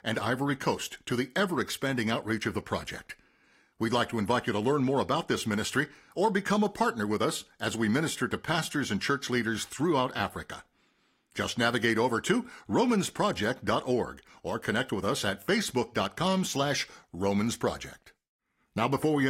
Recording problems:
garbled, watery; slightly; nothing above 14.5 kHz
abrupt cut into speech; at the end

